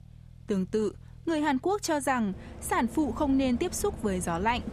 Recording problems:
traffic noise; noticeable; throughout; 15 dB below the speech

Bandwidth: 14.5 kHz